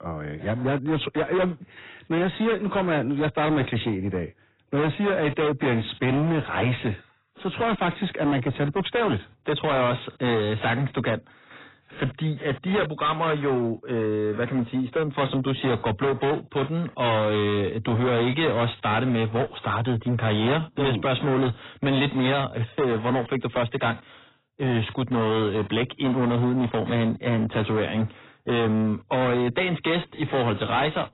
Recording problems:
distortion; heavy; 22% of the sound clipped
garbled, watery; badly; nothing above 4 kHz

